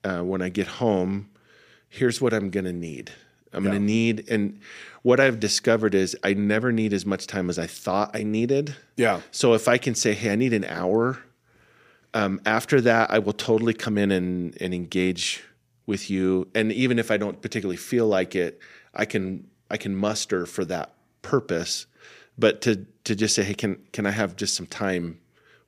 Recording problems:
none

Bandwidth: 15 kHz